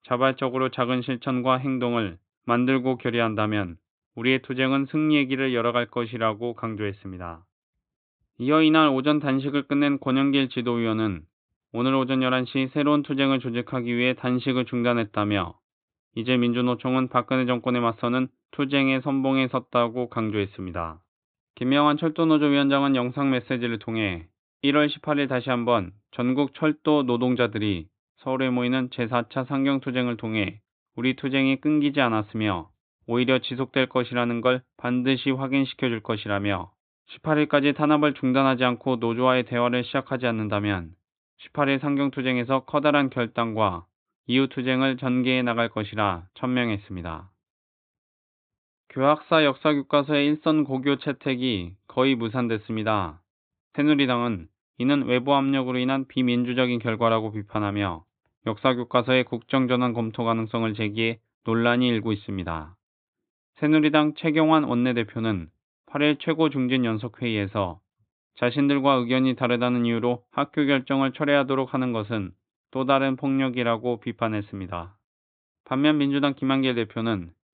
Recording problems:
high frequencies cut off; severe; nothing above 4 kHz

